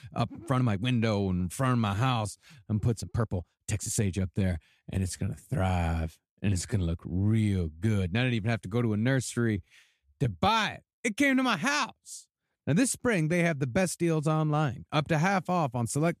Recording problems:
uneven, jittery; strongly; from 0.5 to 11 s

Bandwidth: 14 kHz